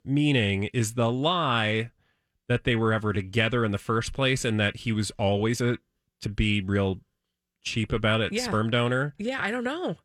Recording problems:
uneven, jittery; slightly; from 1 to 9.5 s

